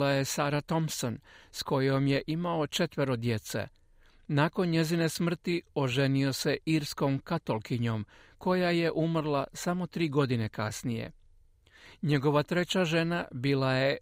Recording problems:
abrupt cut into speech; at the start

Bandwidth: 15.5 kHz